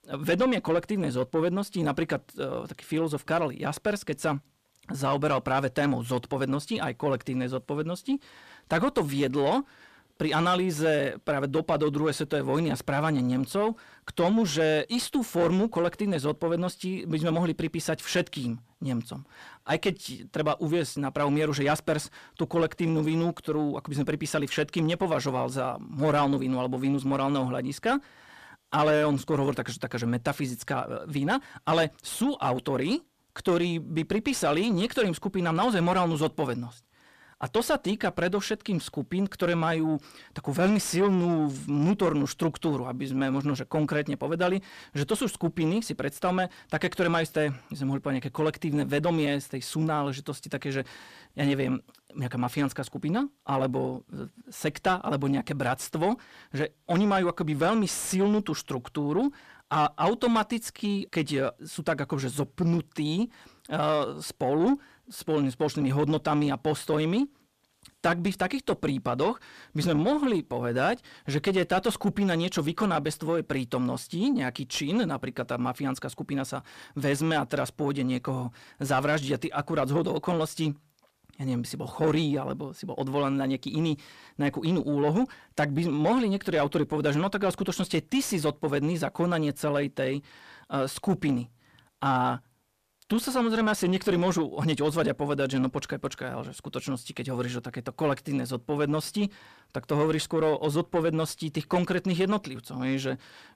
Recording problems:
distortion; slight; 10 dB below the speech

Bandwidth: 14.5 kHz